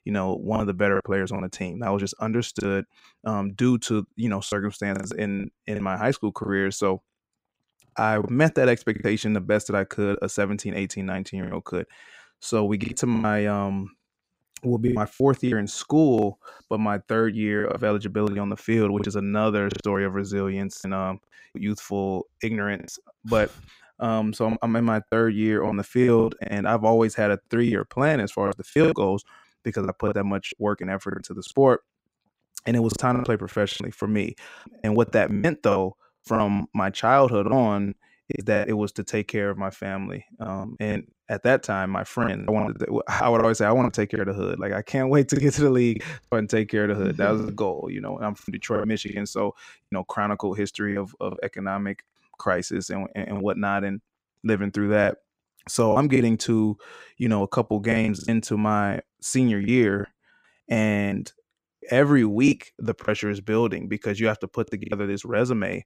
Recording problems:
choppy; very; 8% of the speech affected

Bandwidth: 15.5 kHz